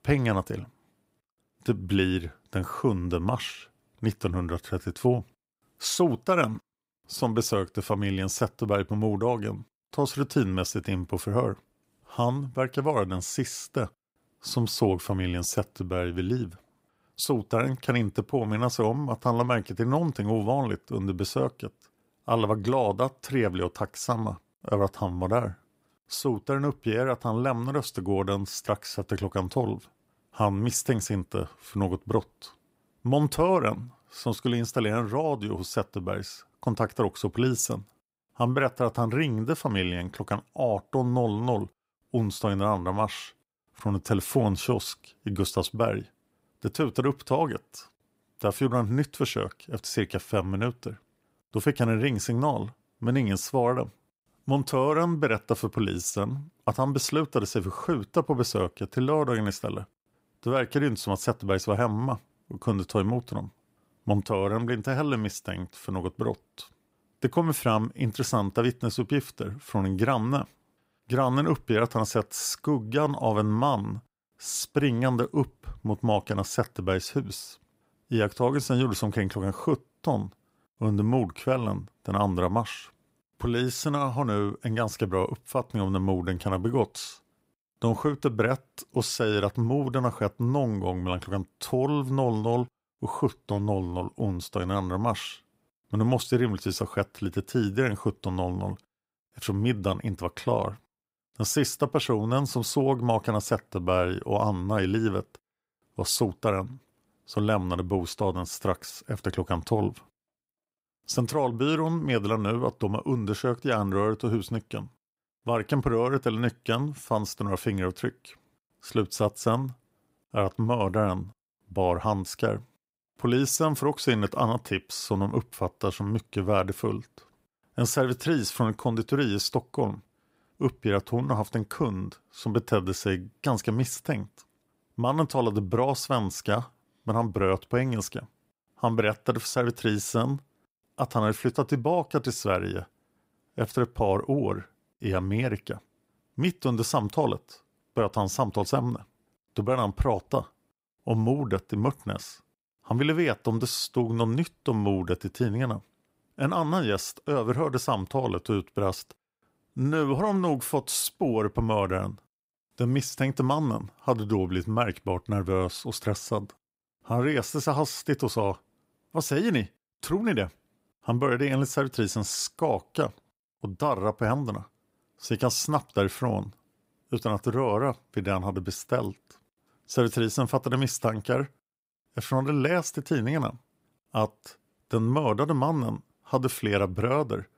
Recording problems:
none

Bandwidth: 15.5 kHz